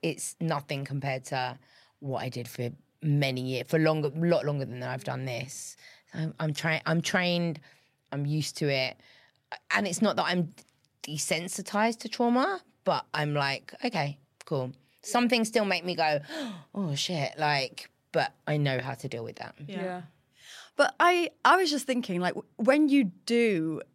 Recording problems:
none

